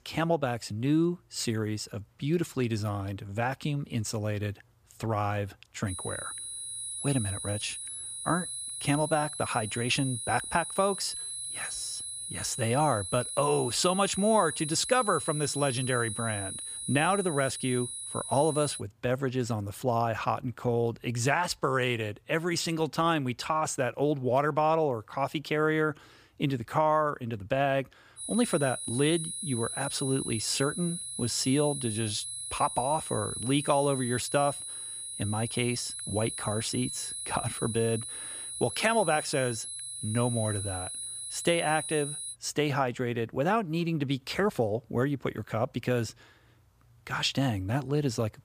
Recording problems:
high-pitched whine; loud; from 6 to 19 s and from 28 to 42 s; 10.5 kHz, 5 dB below the speech

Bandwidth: 15 kHz